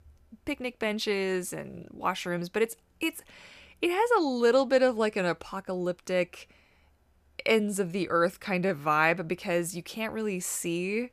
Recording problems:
none

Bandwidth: 14.5 kHz